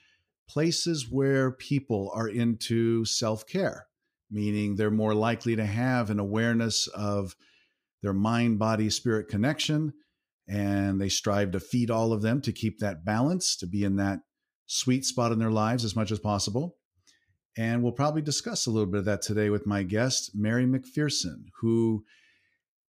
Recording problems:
none

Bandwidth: 15 kHz